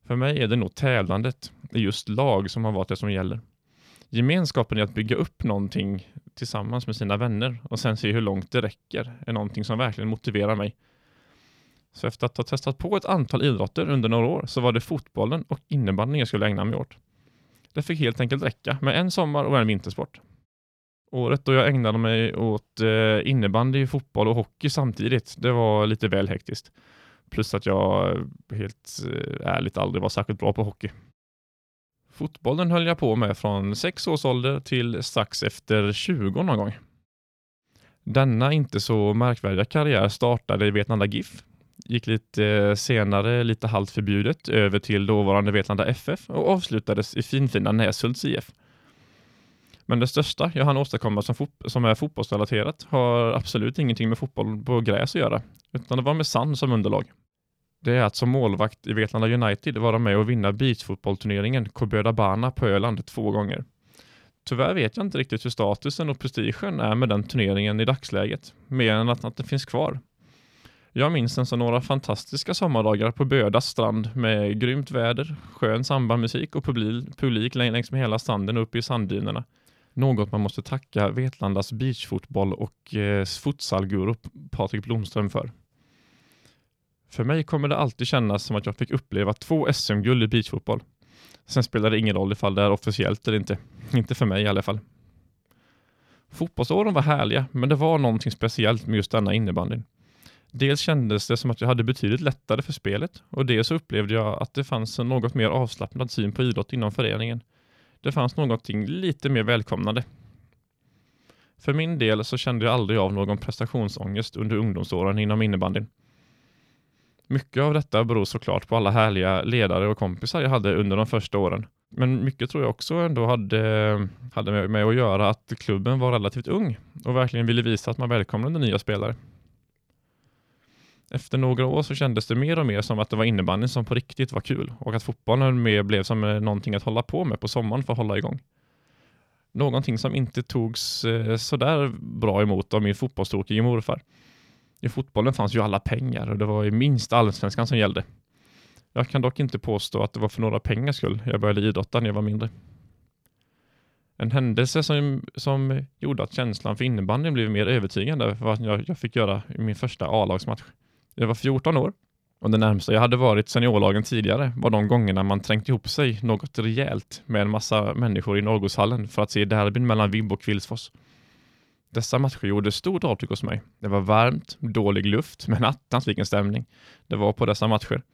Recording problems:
none

